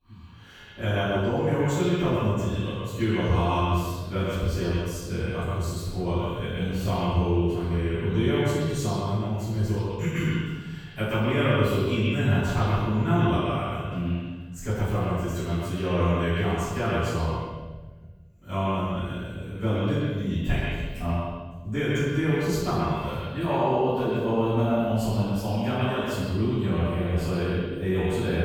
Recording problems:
echo of what is said; strong; throughout; 130 ms later, 7 dB below the speech
room echo; strong; dies away in 1.2 s
off-mic speech; far

